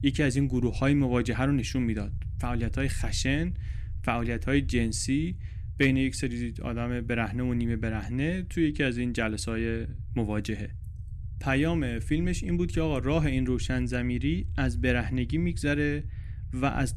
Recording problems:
low rumble; faint; throughout; 20 dB below the speech

